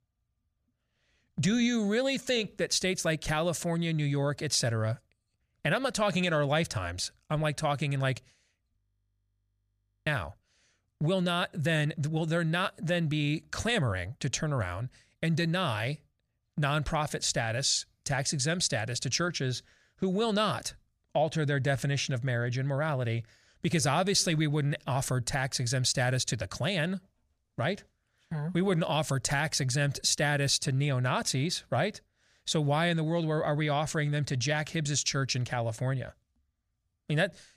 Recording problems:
audio freezing; at 9 s for 1.5 s

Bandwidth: 15 kHz